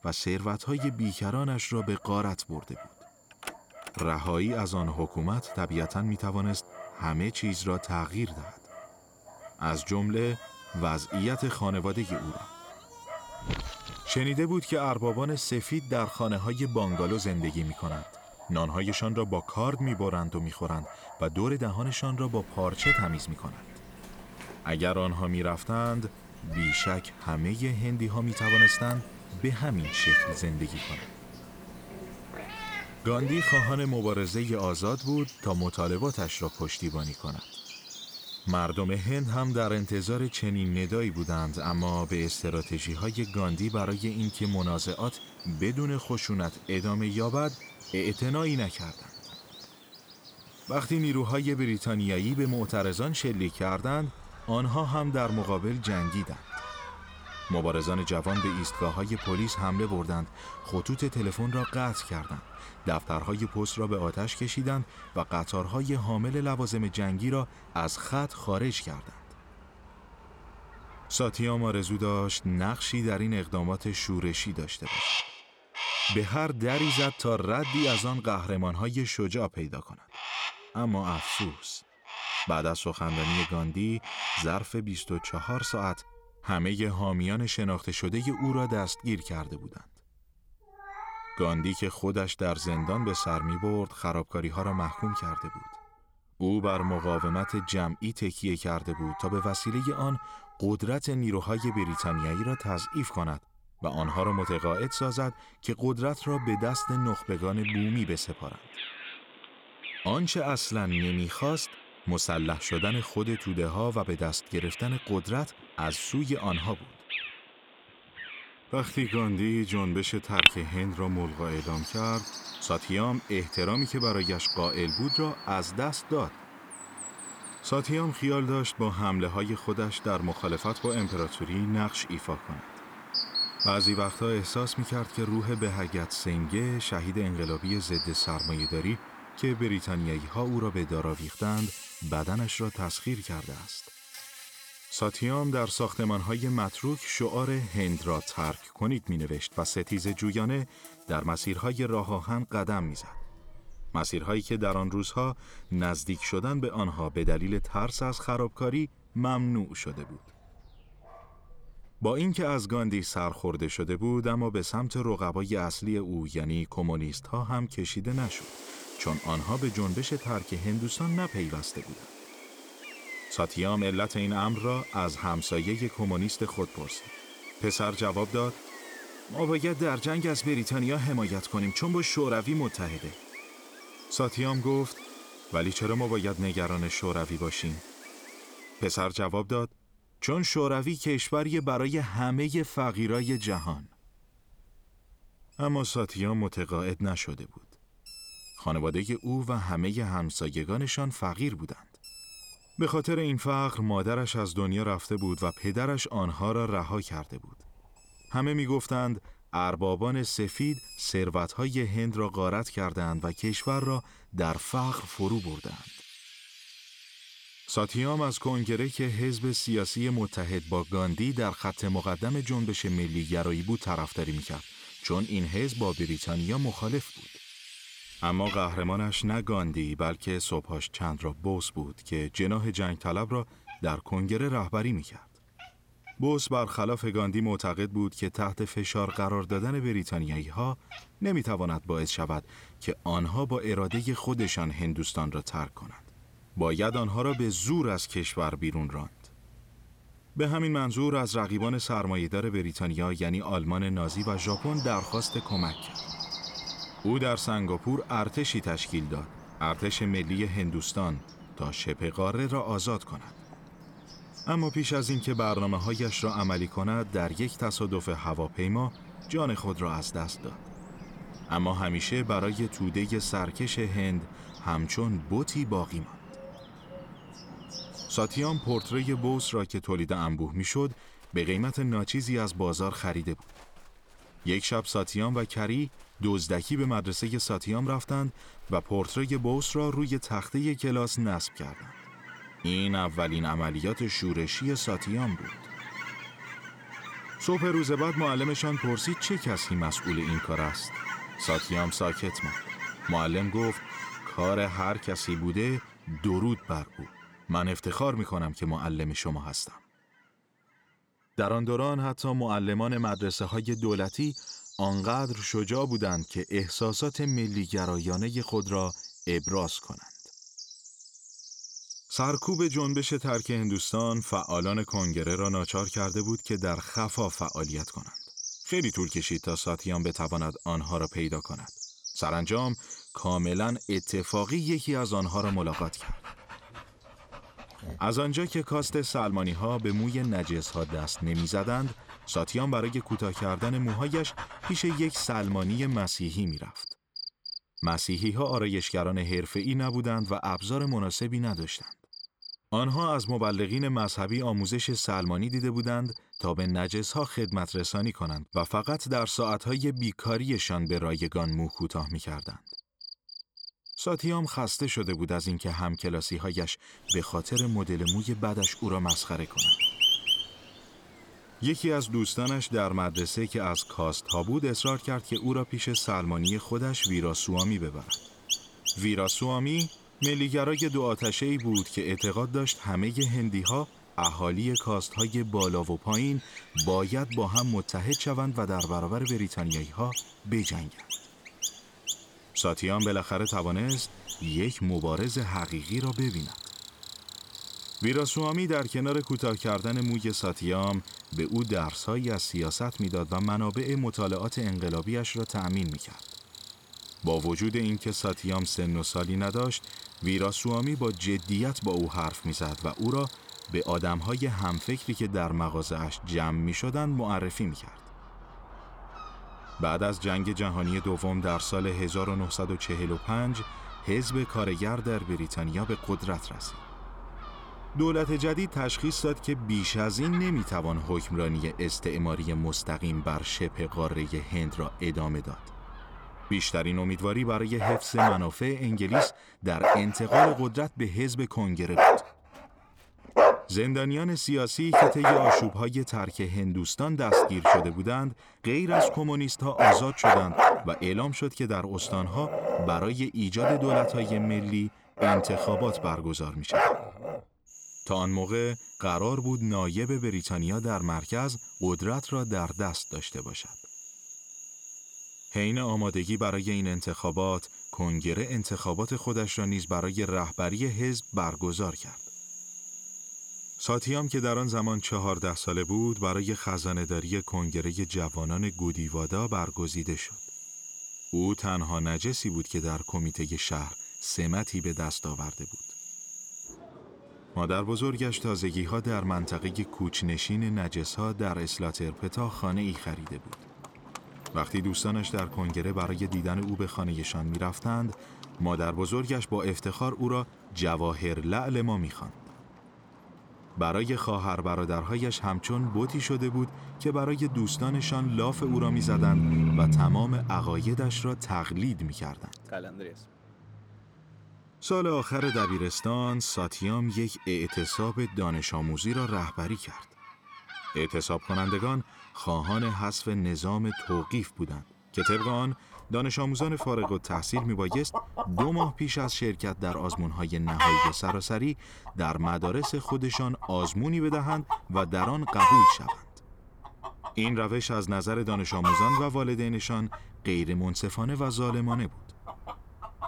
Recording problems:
animal sounds; loud; throughout; 4 dB below the speech

